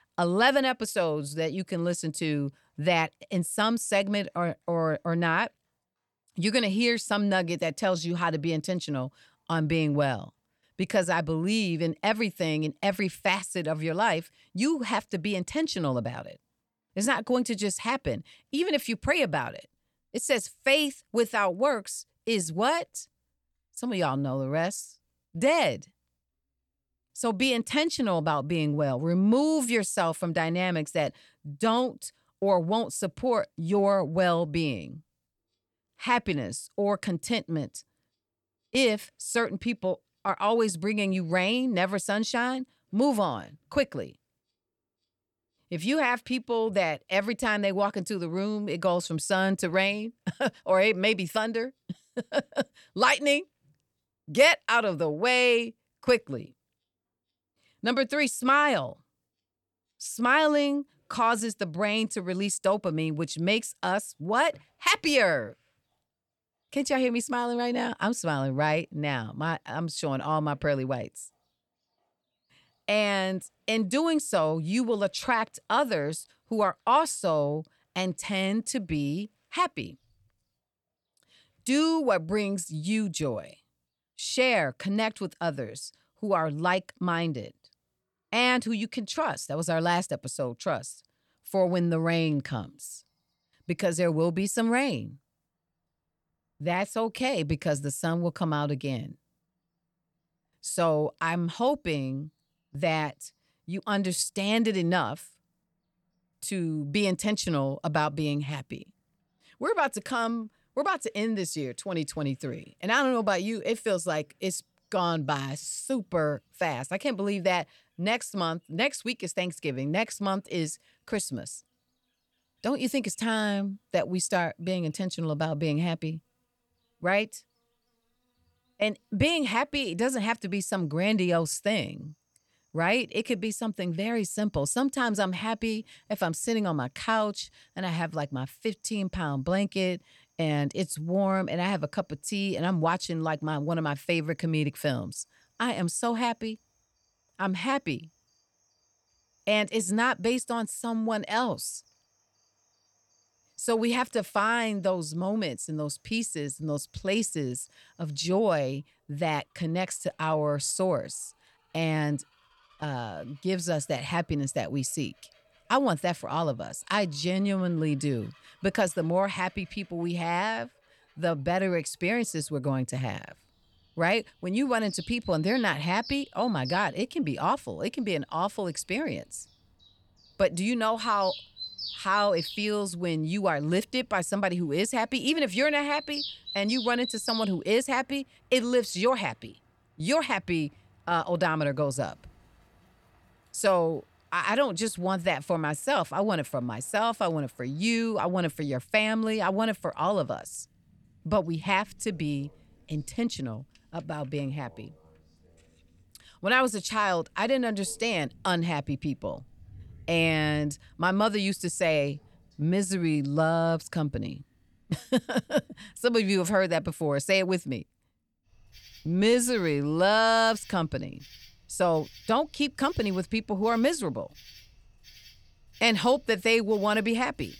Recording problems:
animal sounds; noticeable; throughout; 15 dB below the speech

